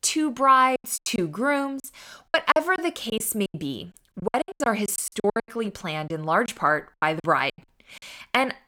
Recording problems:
choppy; very; 17% of the speech affected

